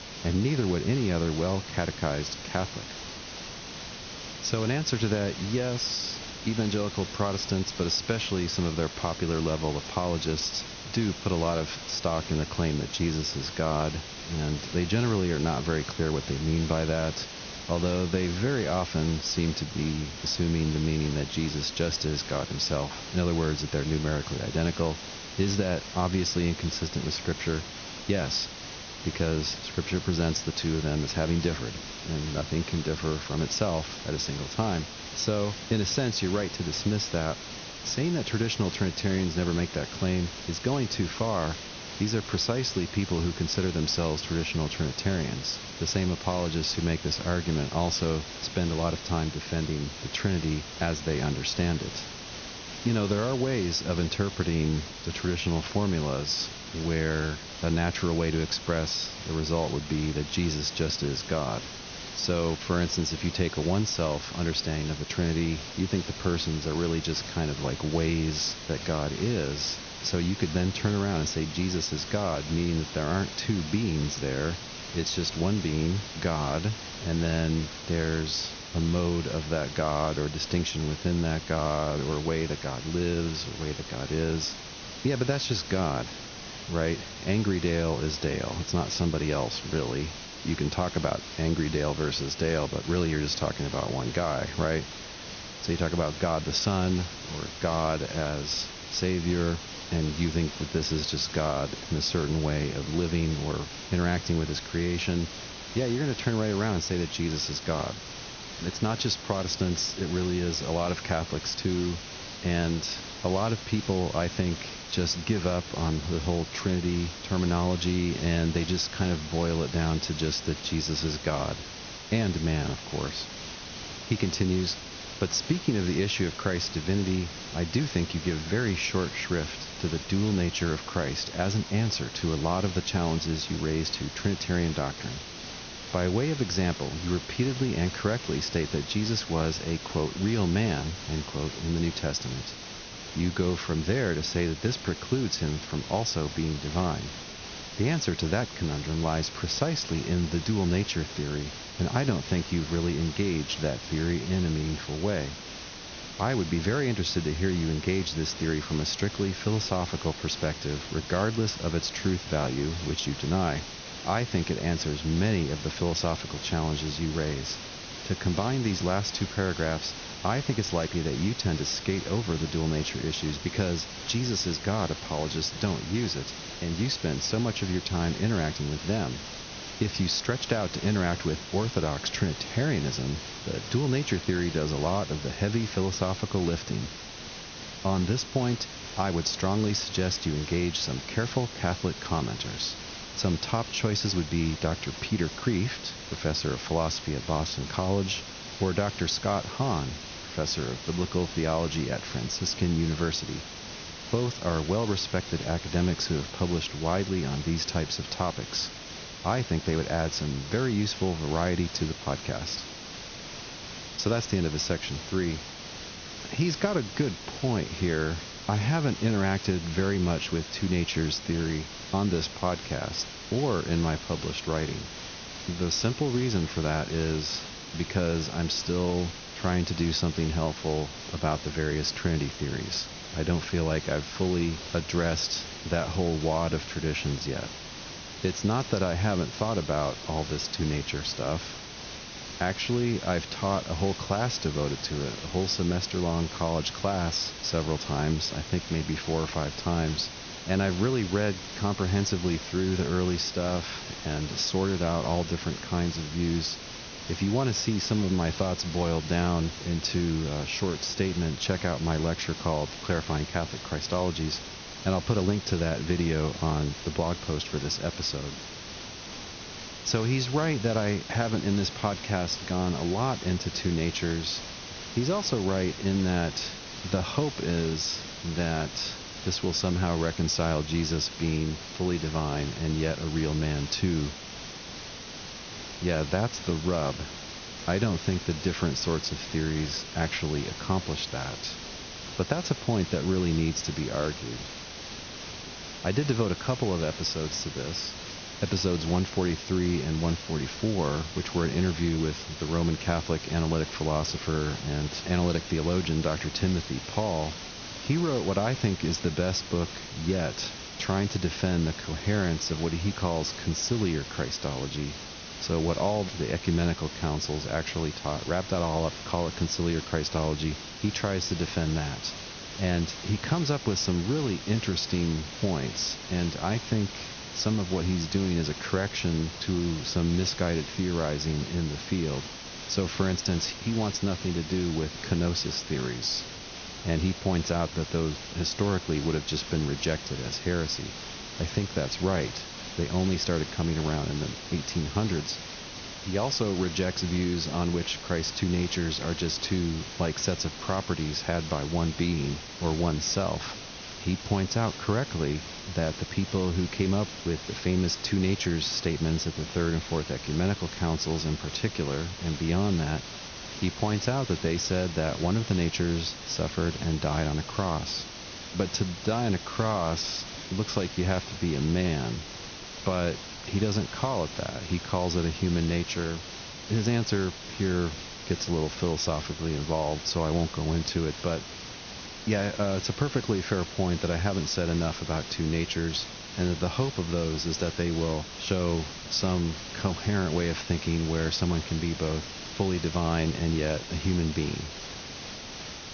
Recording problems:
high frequencies cut off; noticeable; nothing above 6.5 kHz
hiss; loud; throughout; 9 dB below the speech

